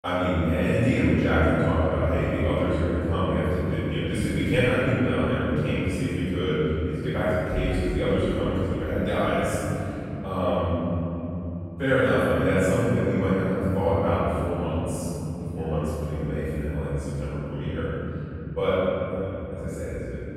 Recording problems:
room echo; strong; dies away in 3 s
off-mic speech; far

